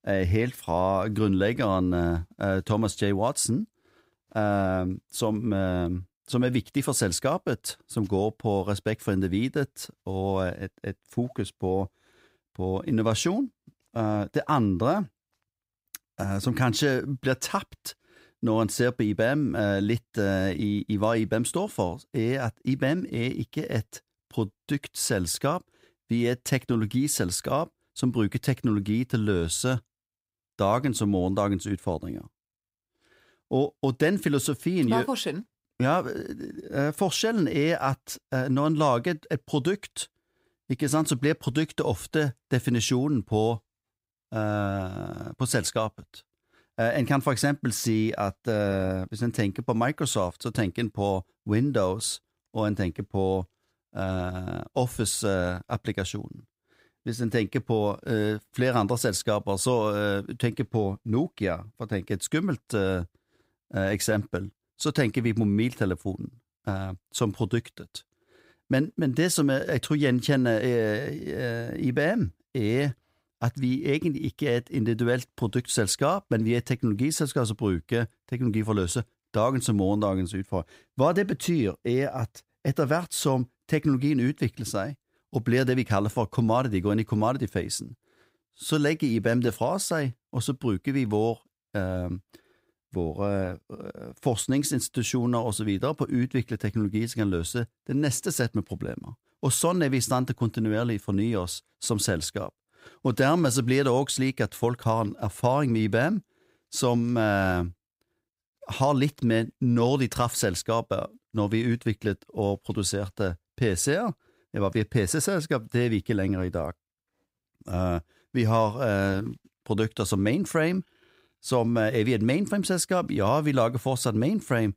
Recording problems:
none

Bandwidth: 15.5 kHz